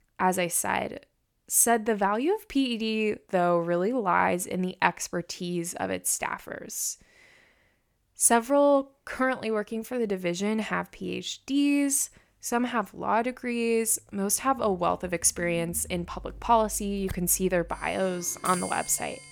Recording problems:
household noises; noticeable; from 15 s on; 15 dB below the speech

